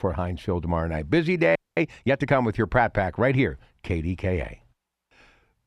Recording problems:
muffled; very slightly; fading above 3.5 kHz
audio freezing; at 1.5 s

